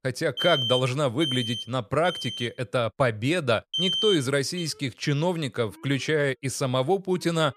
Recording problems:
alarms or sirens; loud; throughout; 3 dB below the speech

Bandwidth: 15 kHz